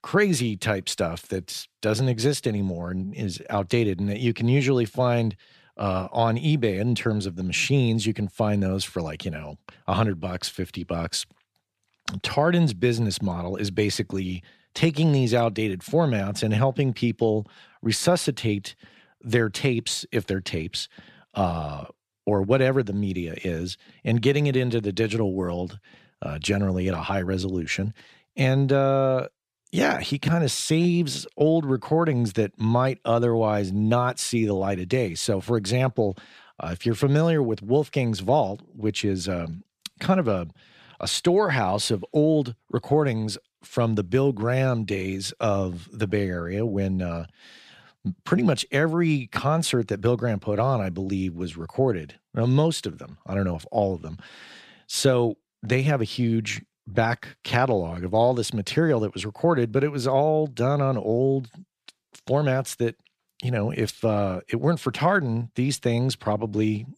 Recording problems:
none

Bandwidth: 14.5 kHz